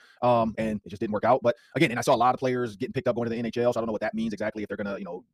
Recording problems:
wrong speed, natural pitch; too fast; 1.8 times normal speed

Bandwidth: 15 kHz